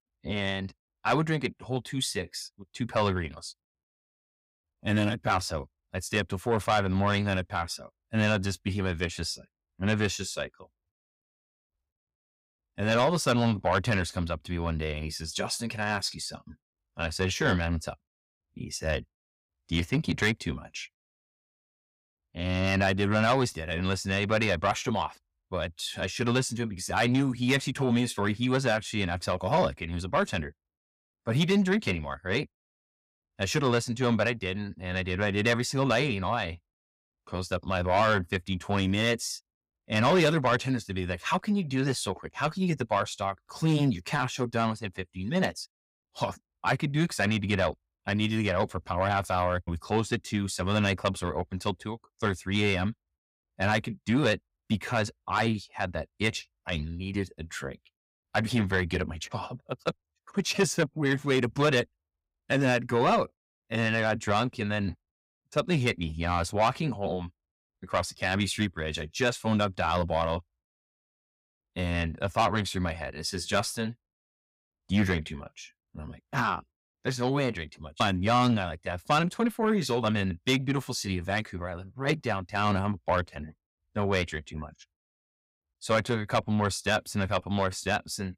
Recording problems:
distortion; slight; 10 dB below the speech

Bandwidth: 15.5 kHz